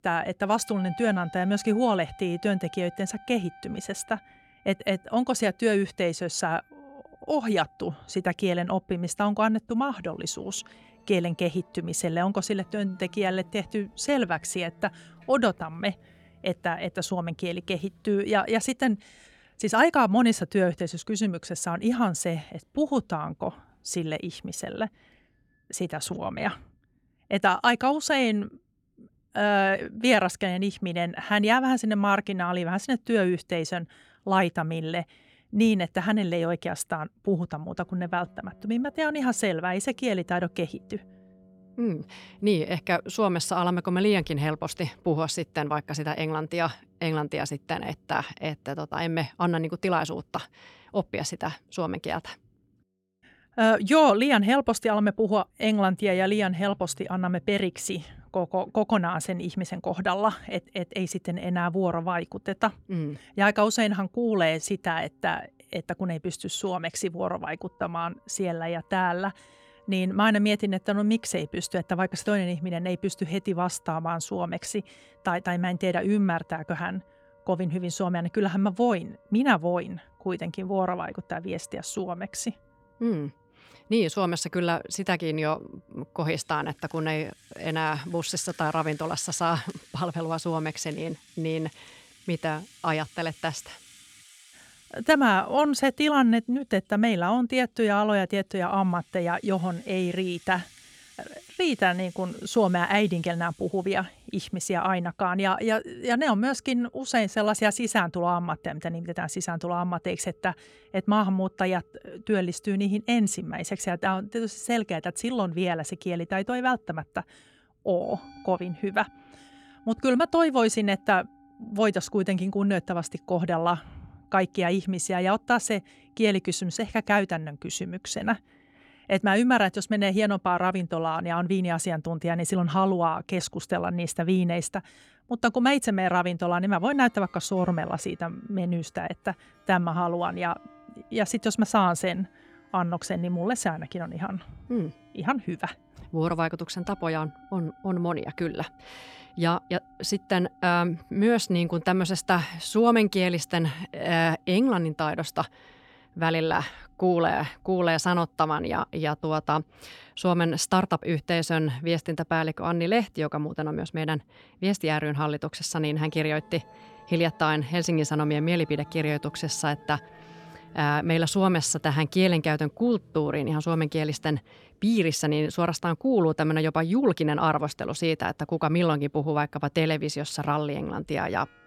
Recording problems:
background music; faint; throughout; 30 dB below the speech

